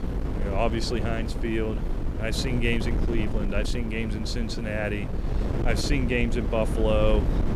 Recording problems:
wind noise on the microphone; heavy; 8 dB below the speech

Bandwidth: 15.5 kHz